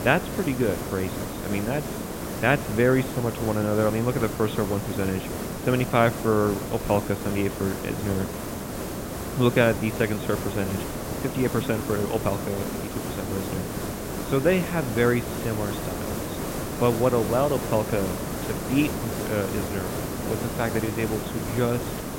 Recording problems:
high frequencies cut off; severe; nothing above 4 kHz
hiss; loud; throughout; 5 dB below the speech

